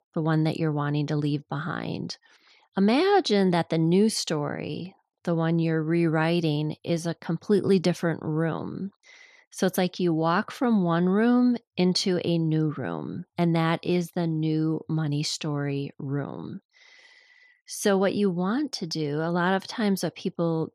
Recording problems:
none

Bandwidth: 13.5 kHz